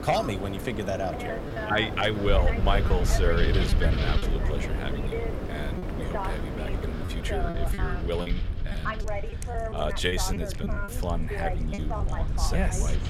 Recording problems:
wind noise on the microphone; heavy; 7 dB below the speech
voice in the background; loud; throughout; 6 dB below the speech
animal sounds; noticeable; from 9 s on; 15 dB below the speech
low rumble; noticeable; from 2.5 s on; 15 dB below the speech
choppy; occasionally; 4% of the speech affected

